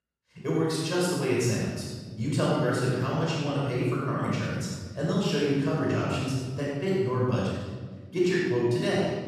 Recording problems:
room echo; strong; dies away in 1.5 s
off-mic speech; far

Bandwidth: 14.5 kHz